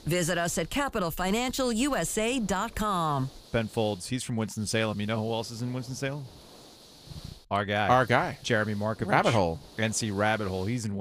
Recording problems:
hiss; faint; throughout; 20 dB below the speech
abrupt cut into speech; at the end

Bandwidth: 15 kHz